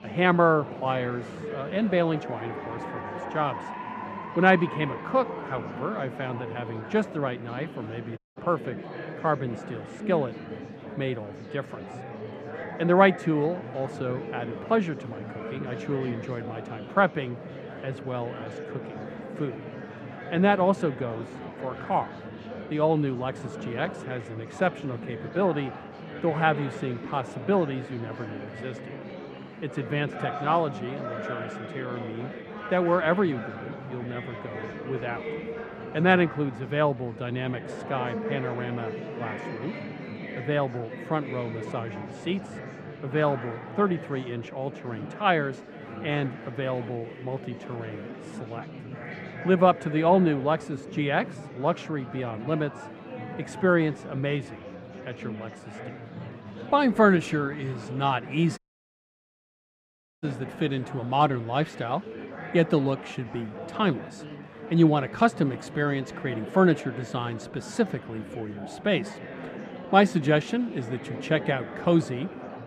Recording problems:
muffled; very; fading above 4 kHz
murmuring crowd; noticeable; throughout; 10 dB below the speech
audio cutting out; at 8 s and at 59 s for 1.5 s

